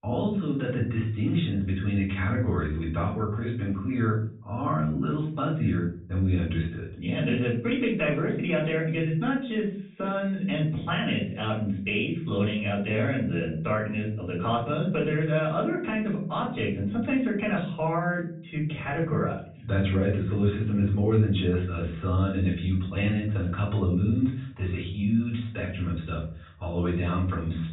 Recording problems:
off-mic speech; far
high frequencies cut off; severe; nothing above 4 kHz
room echo; slight; dies away in 0.5 s

